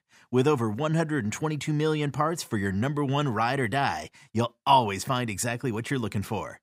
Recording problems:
none

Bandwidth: 15.5 kHz